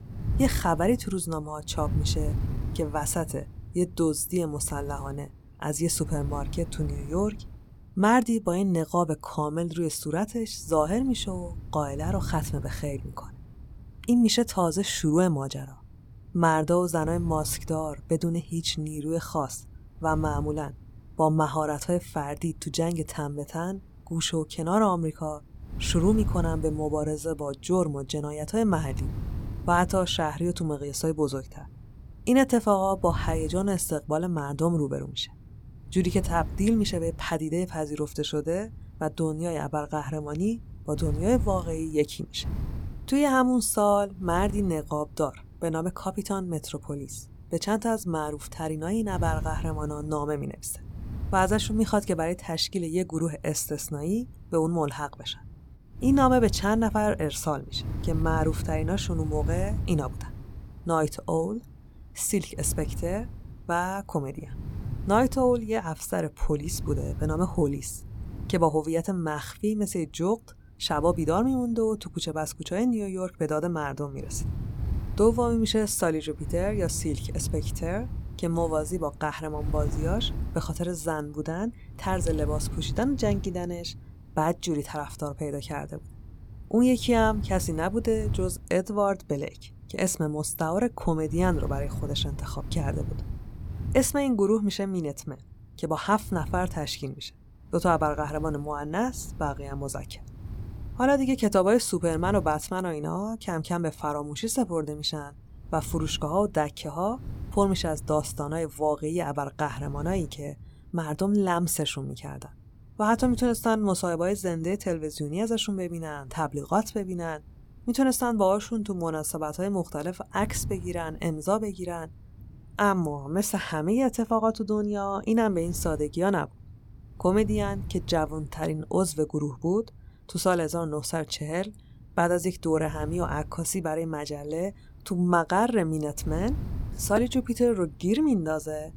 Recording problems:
wind noise on the microphone; occasional gusts; 20 dB below the speech

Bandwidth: 17.5 kHz